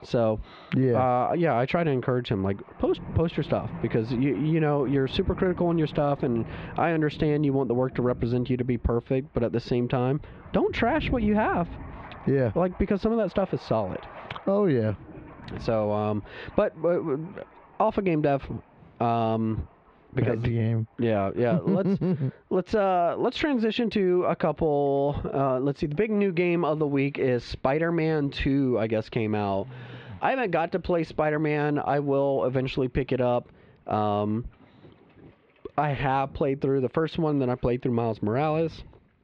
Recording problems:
muffled; slightly; fading above 2.5 kHz
squashed, flat; somewhat, background pumping
rain or running water; noticeable; throughout; 15 dB below the speech

